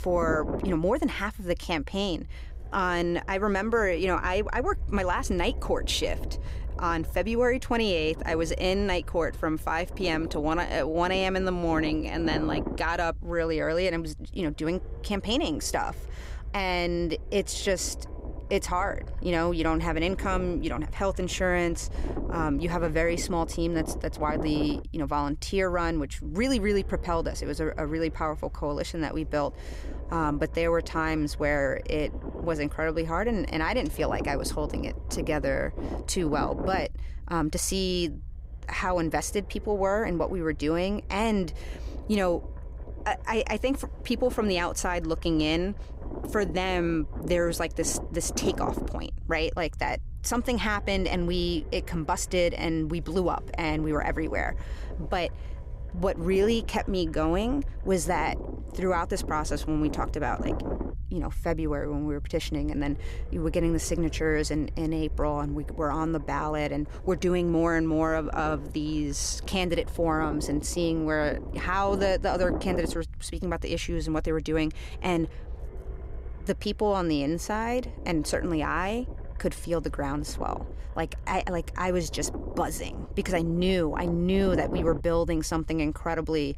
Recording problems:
low rumble; noticeable; throughout; 15 dB below the speech

